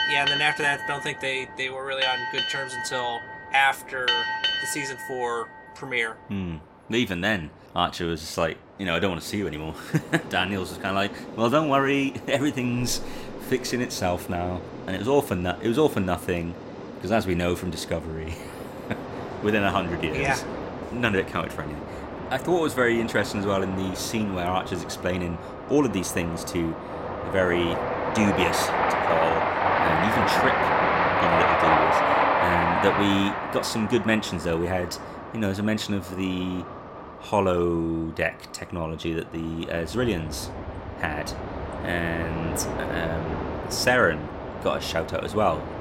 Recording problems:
train or aircraft noise; loud; throughout; 2 dB below the speech

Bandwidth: 16 kHz